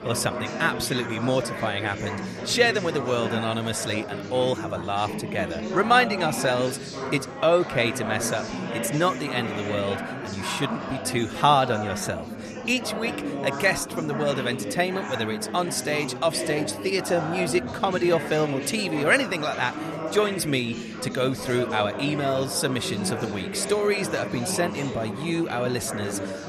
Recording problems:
chatter from many people; loud; throughout; 6 dB below the speech

